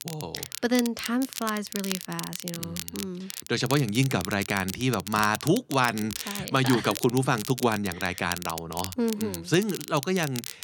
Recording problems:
crackle, like an old record; loud; 9 dB below the speech

